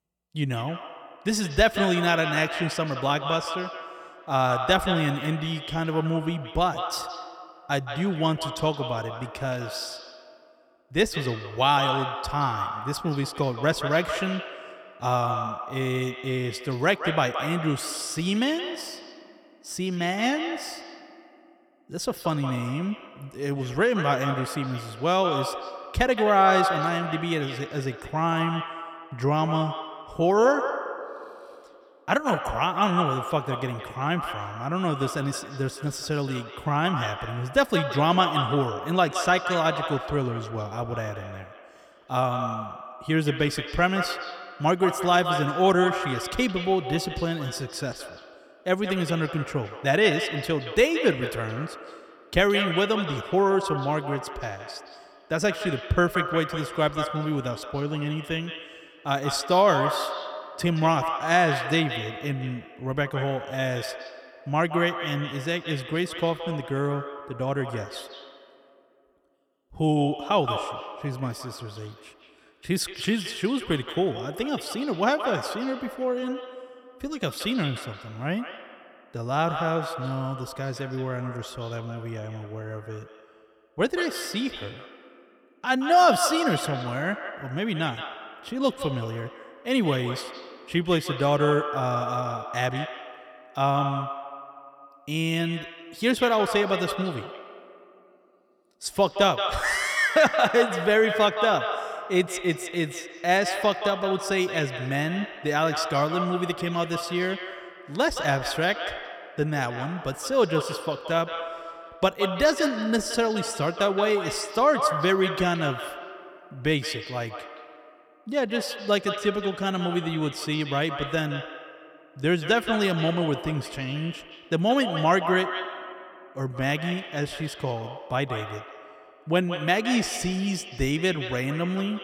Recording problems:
echo of what is said; strong; throughout; 170 ms later, 7 dB below the speech

